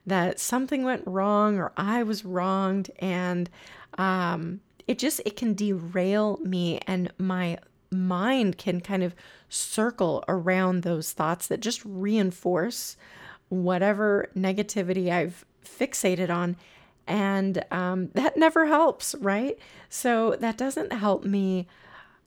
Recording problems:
none

